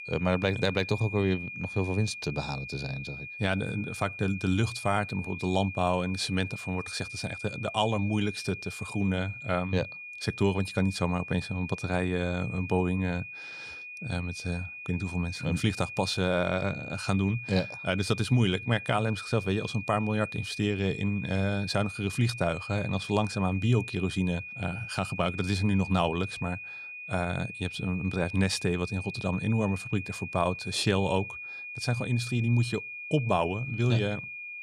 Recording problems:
high-pitched whine; loud; throughout; 2.5 kHz, 9 dB below the speech

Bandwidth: 14.5 kHz